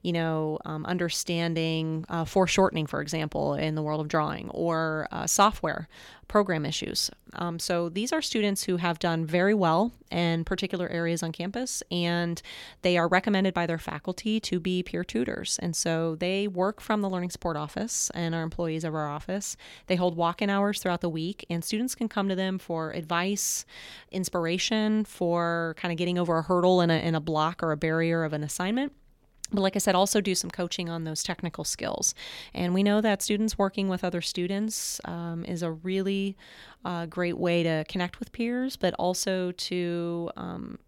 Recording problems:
none

